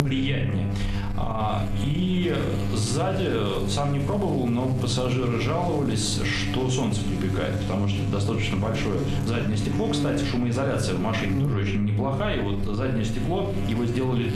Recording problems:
room echo; slight; dies away in 0.5 s
off-mic speech; somewhat distant
squashed, flat; somewhat
electrical hum; loud; throughout; 50 Hz, 9 dB below the speech

